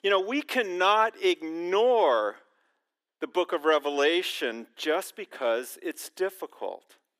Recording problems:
thin; somewhat; fading below 300 Hz

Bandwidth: 15 kHz